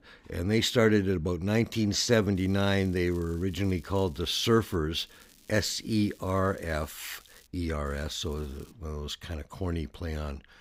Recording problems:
crackling; faint; from 2.5 to 5 s, from 5 to 7.5 s and at 8 s; 30 dB below the speech

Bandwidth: 15.5 kHz